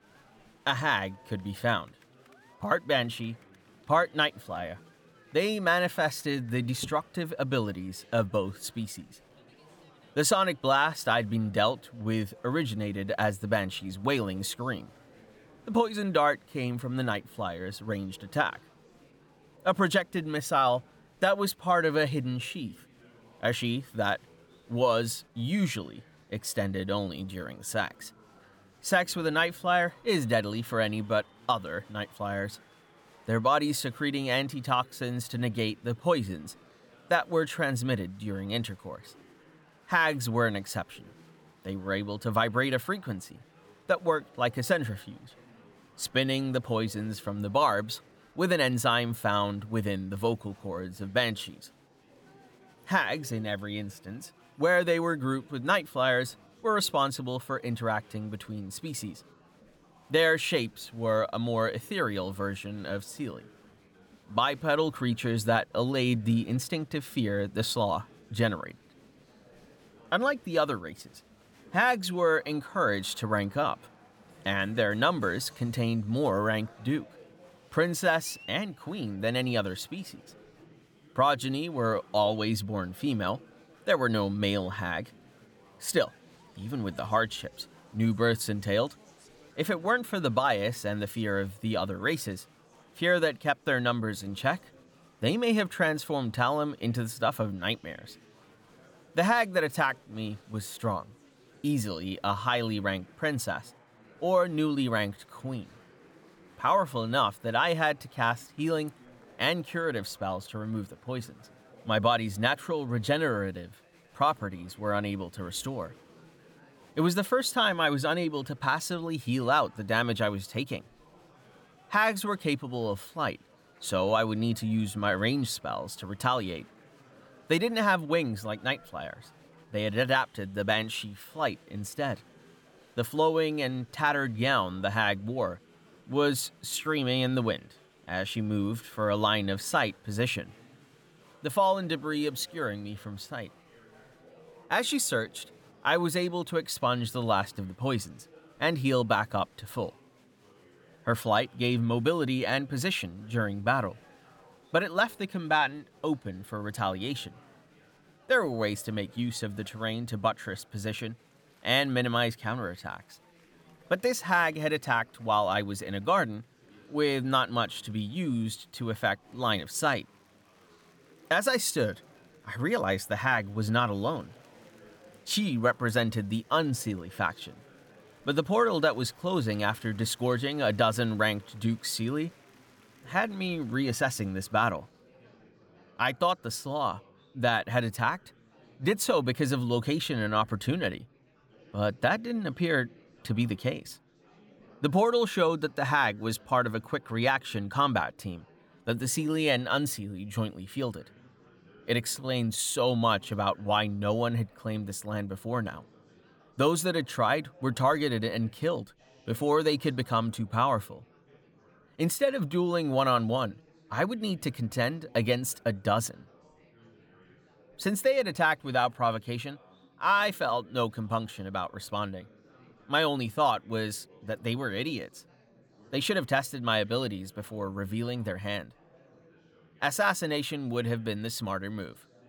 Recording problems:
murmuring crowd; faint; throughout; 30 dB below the speech

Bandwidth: 18.5 kHz